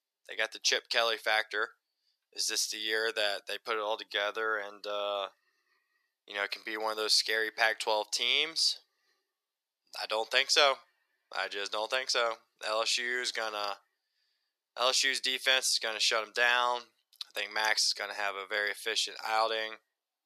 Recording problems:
thin; very; fading below 450 Hz

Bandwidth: 14.5 kHz